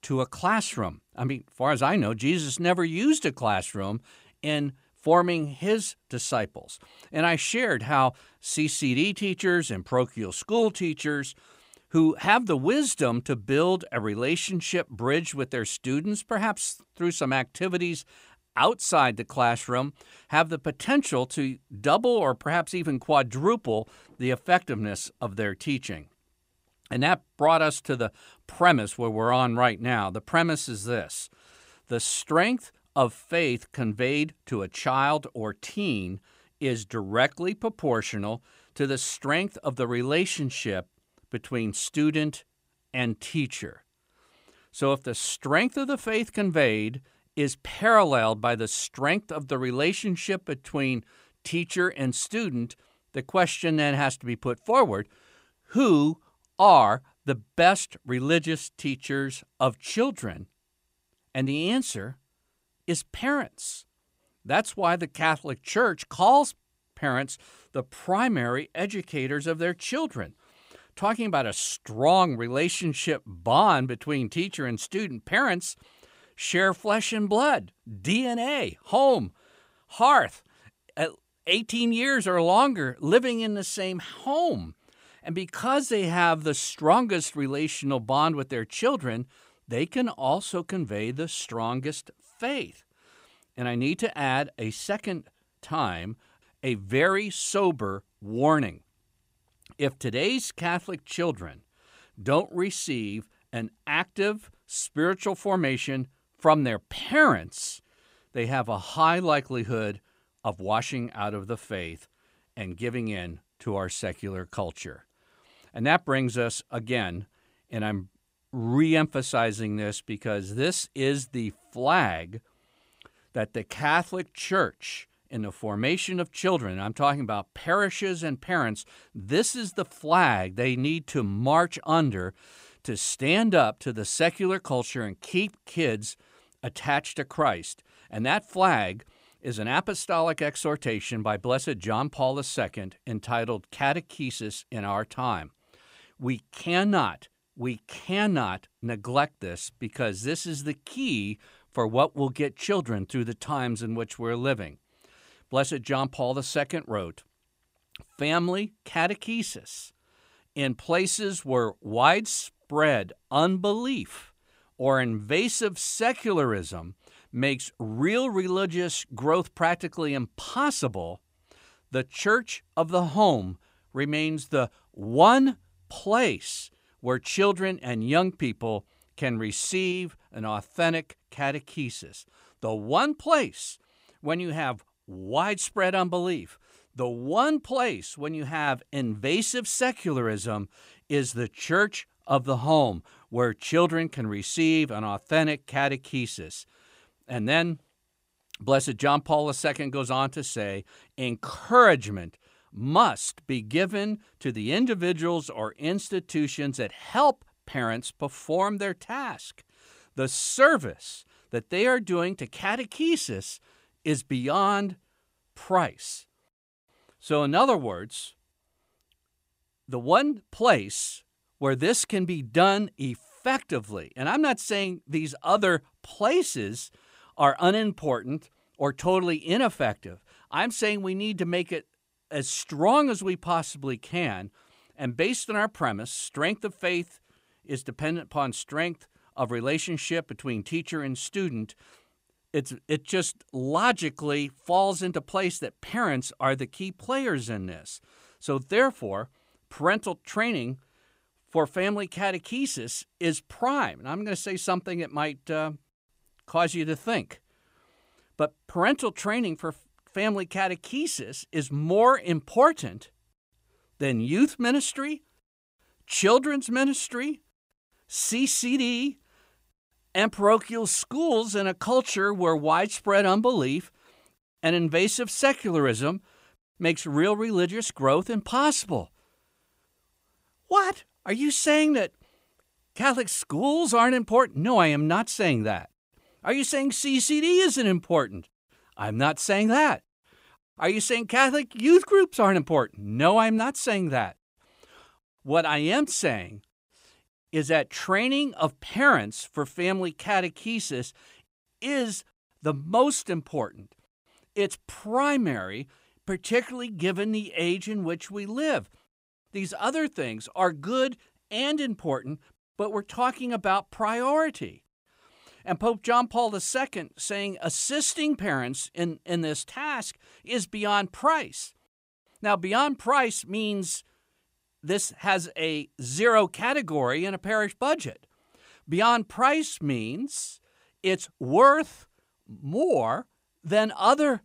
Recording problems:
none

